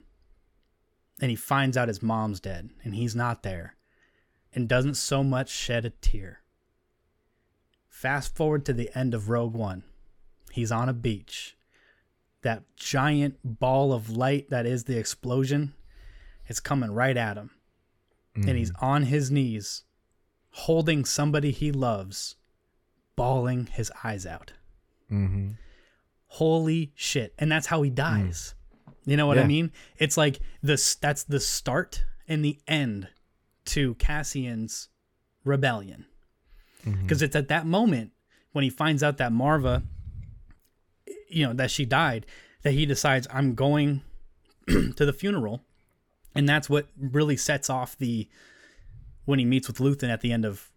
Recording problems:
none

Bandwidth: 17.5 kHz